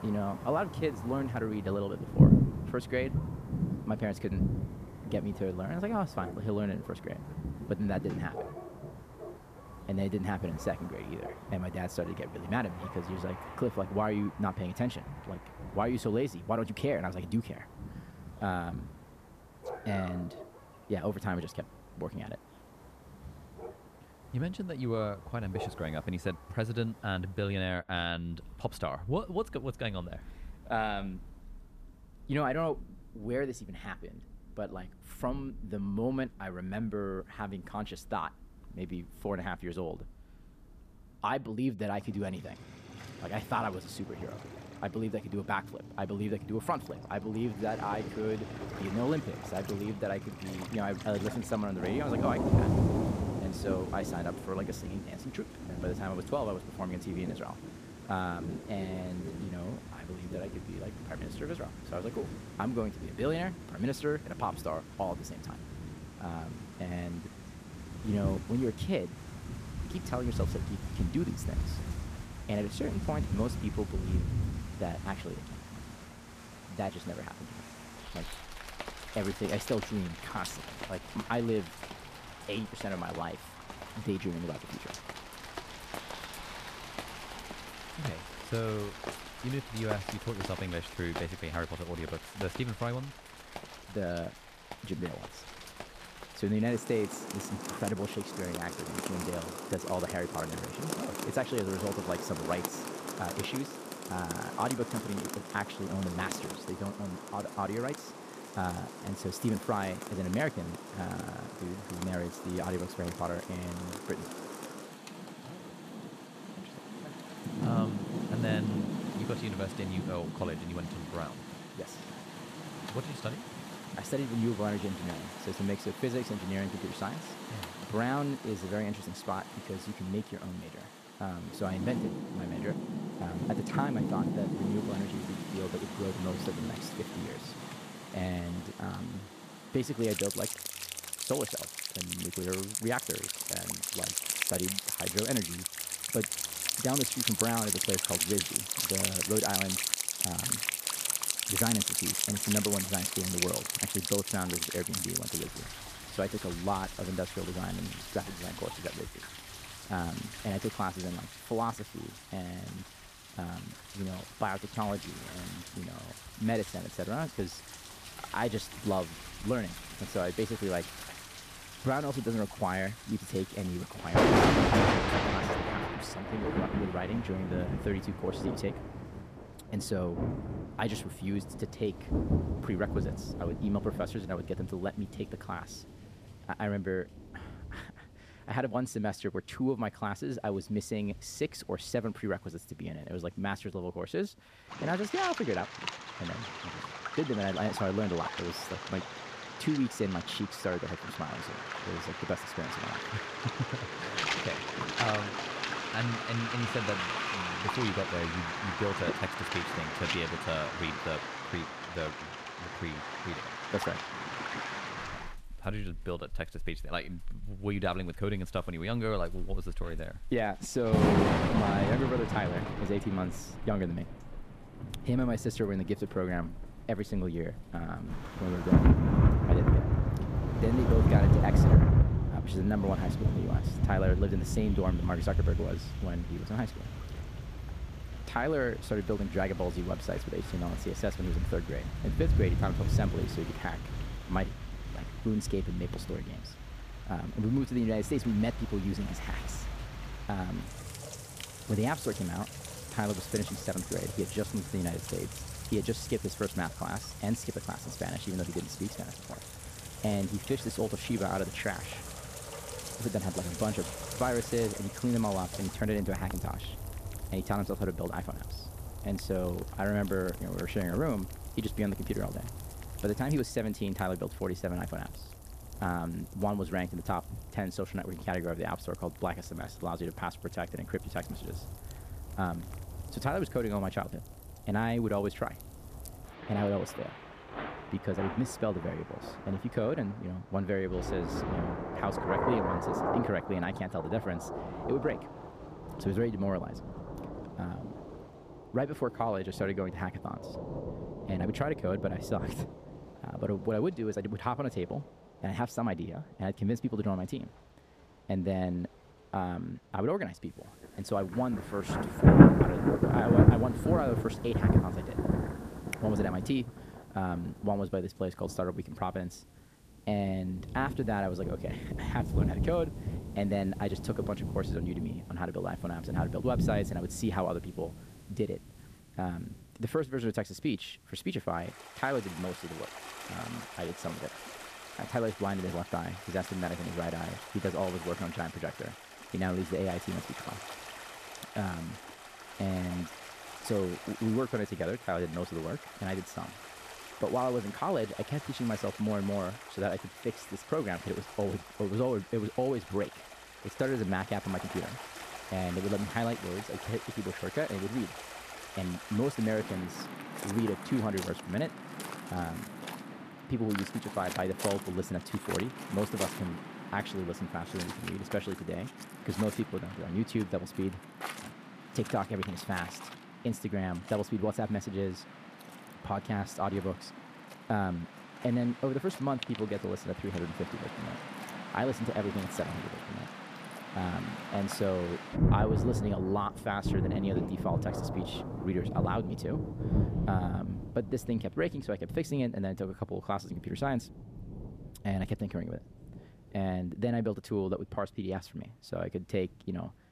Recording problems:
rain or running water; loud; throughout; as loud as the speech

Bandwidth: 14.5 kHz